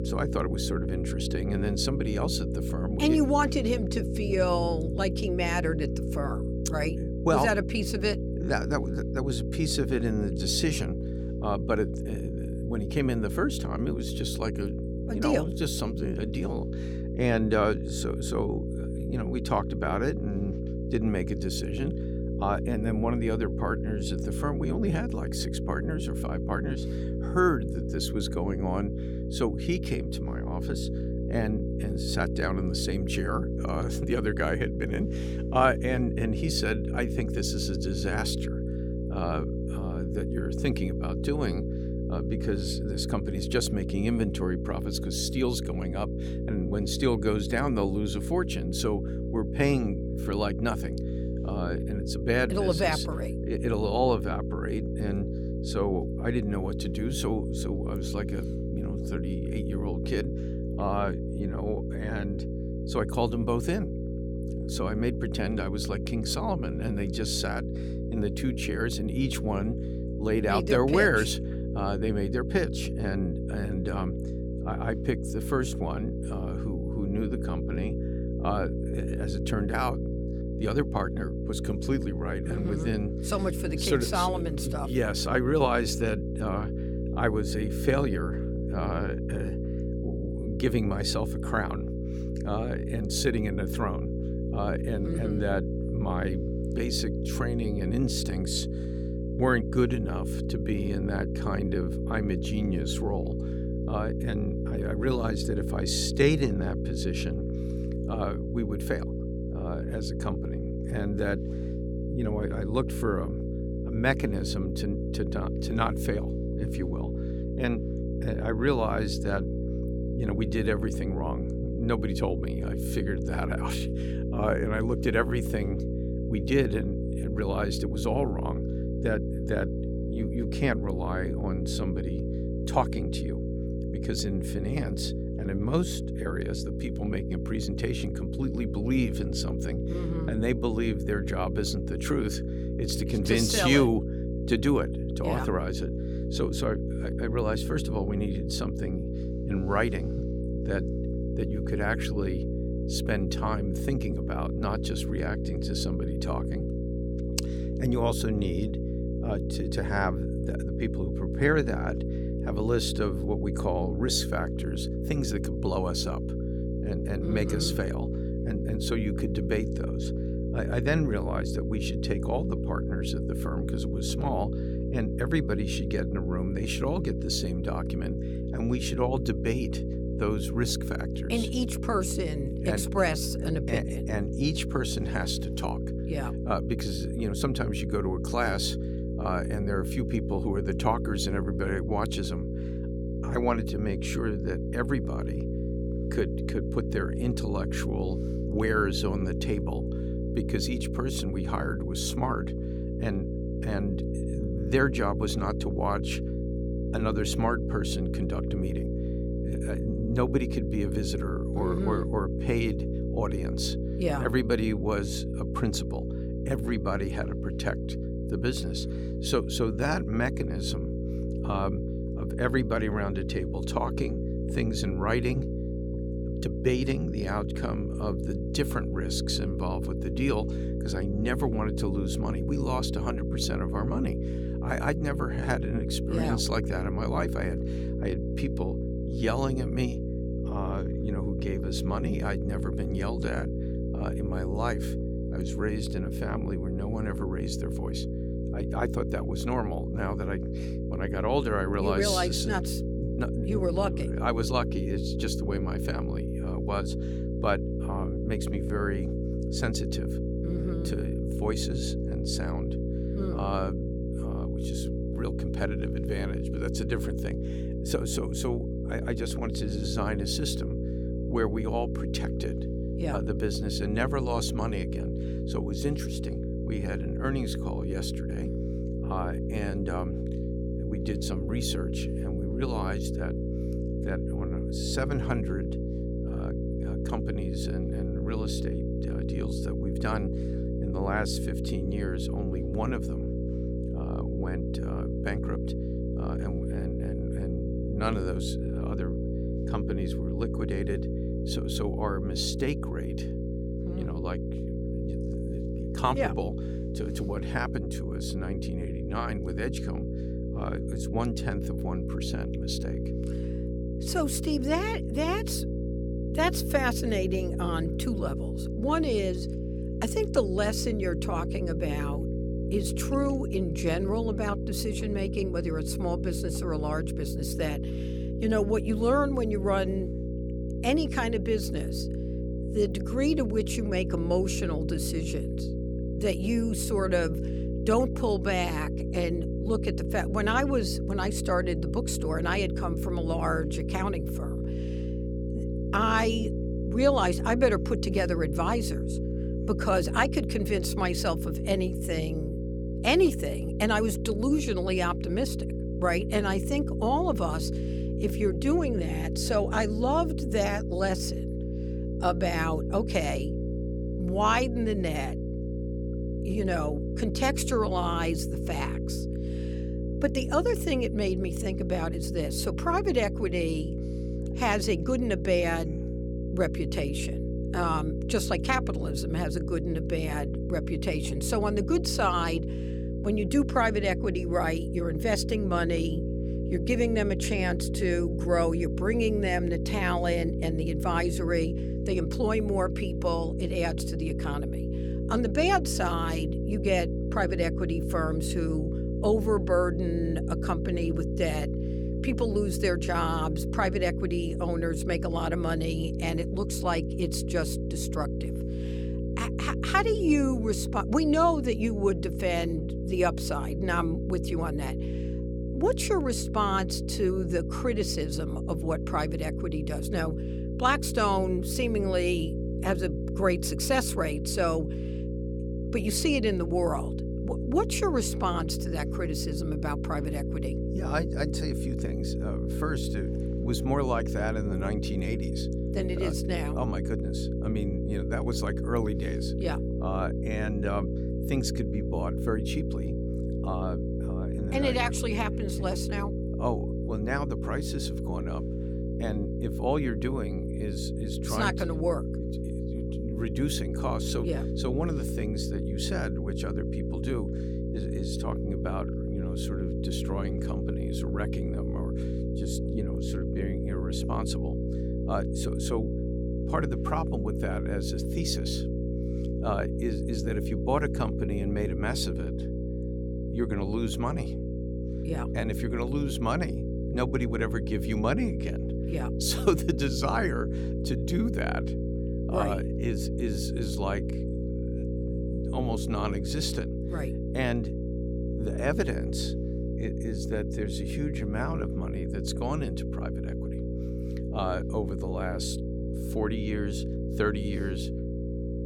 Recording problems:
electrical hum; loud; throughout; 60 Hz, 7 dB below the speech

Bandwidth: 18 kHz